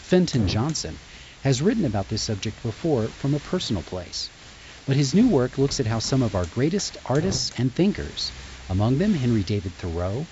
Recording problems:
high frequencies cut off; noticeable; nothing above 8 kHz
hiss; noticeable; throughout; 15 dB below the speech

